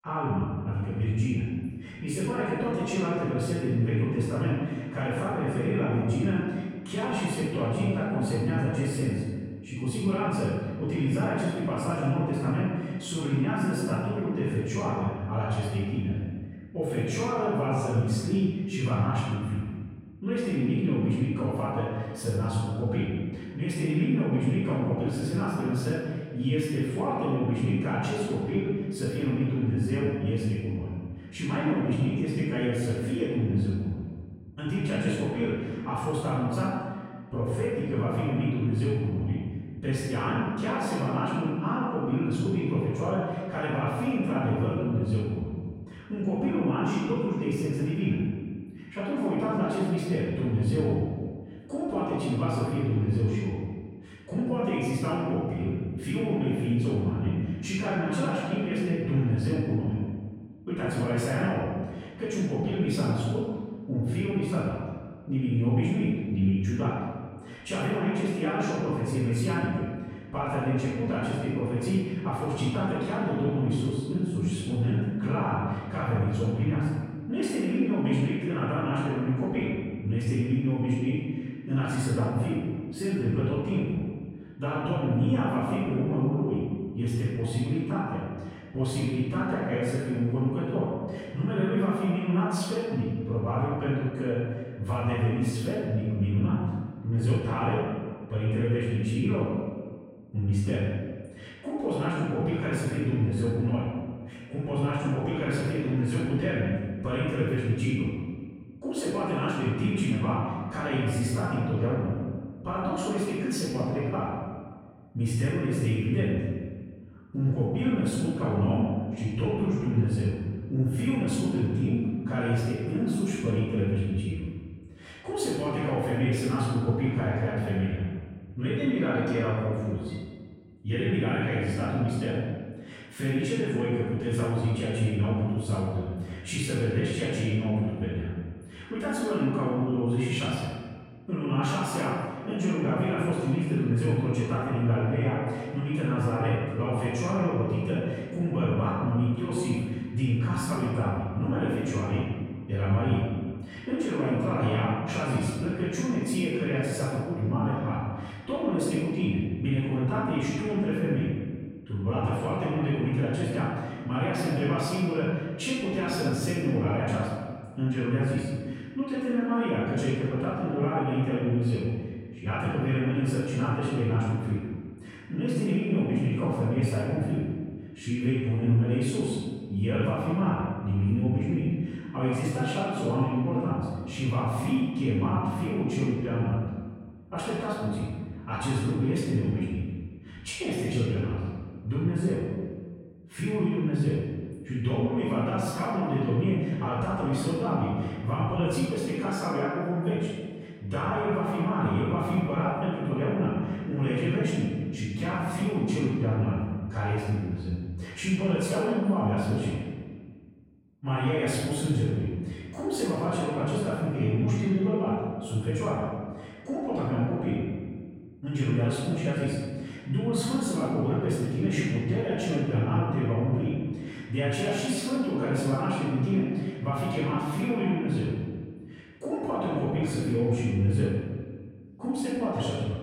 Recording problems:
room echo; strong; dies away in 1.5 s
off-mic speech; far

